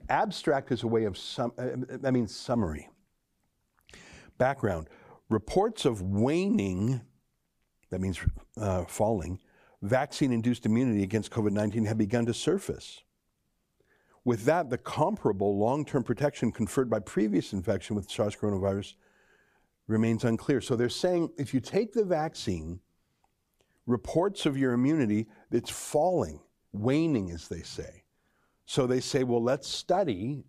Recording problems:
none

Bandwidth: 15 kHz